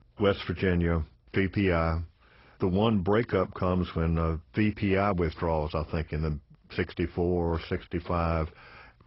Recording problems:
garbled, watery; badly; nothing above 5.5 kHz

